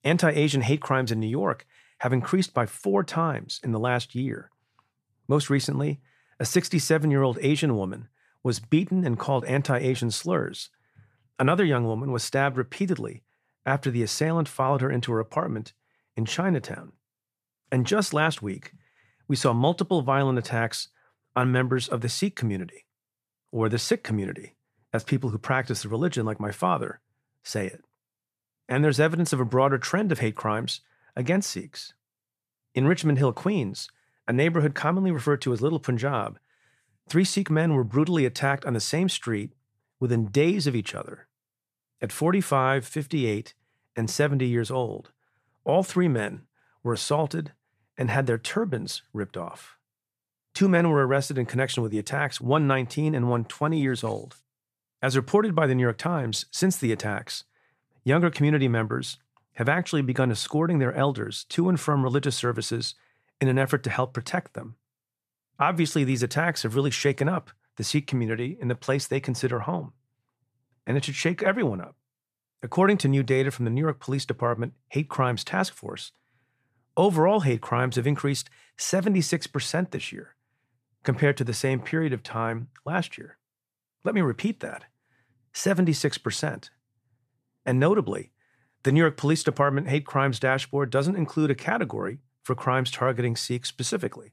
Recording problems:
none

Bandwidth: 14.5 kHz